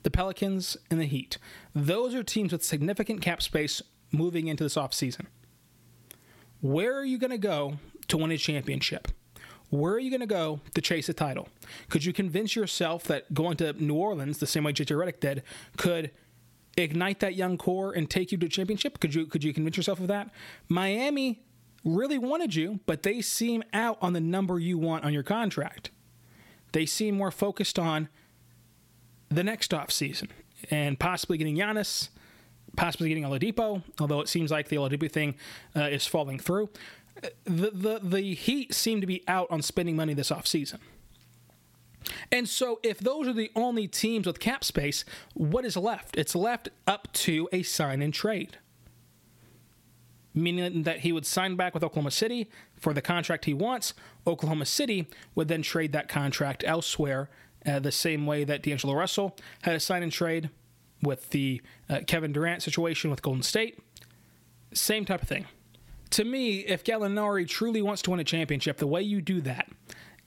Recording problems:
squashed, flat; somewhat

